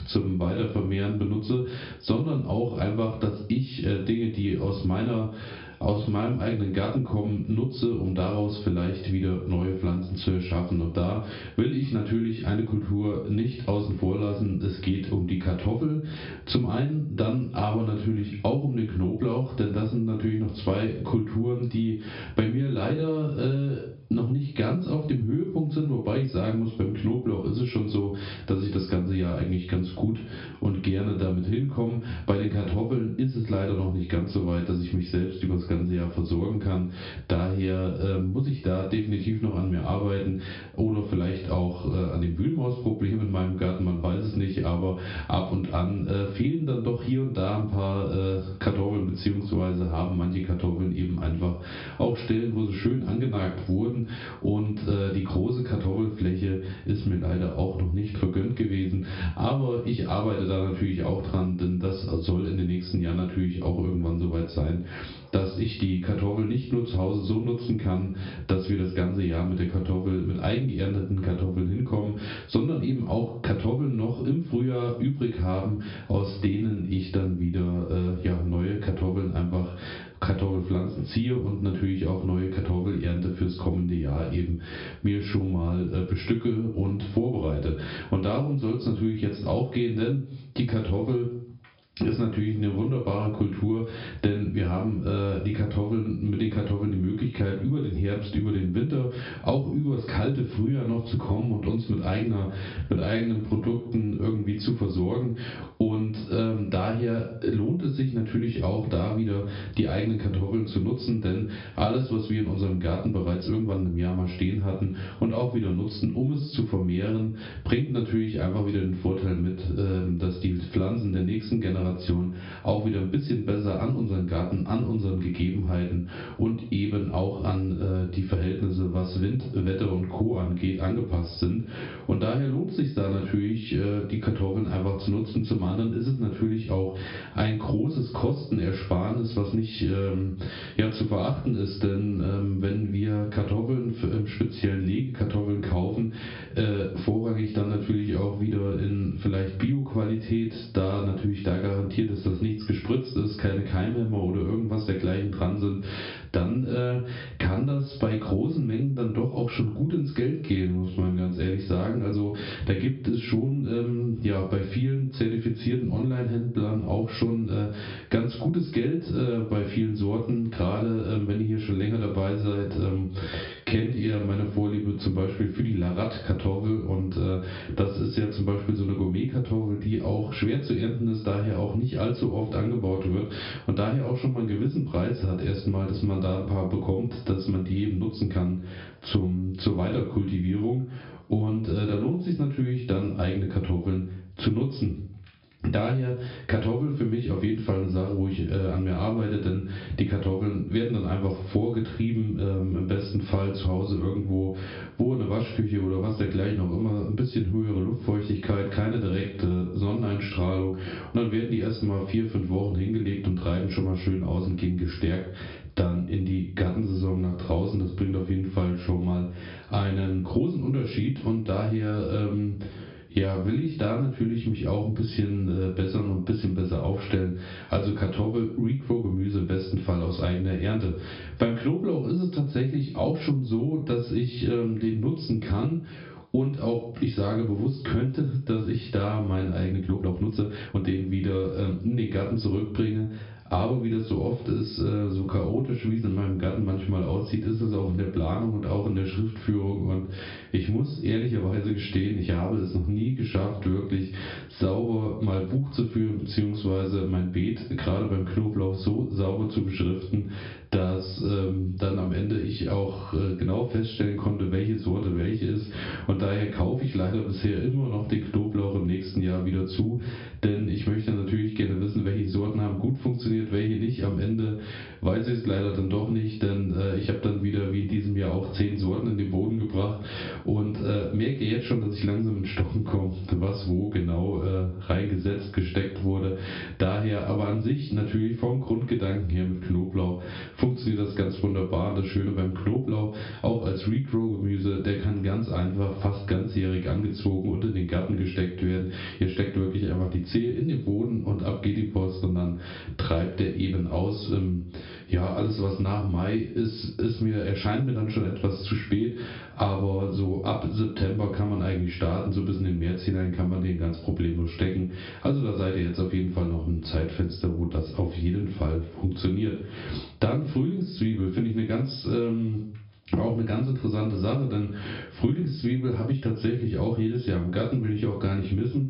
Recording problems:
off-mic speech; far
high frequencies cut off; noticeable; nothing above 5.5 kHz
room echo; slight; dies away in 0.3 s
squashed, flat; somewhat
uneven, jittery; strongly; from 6 s to 4:01

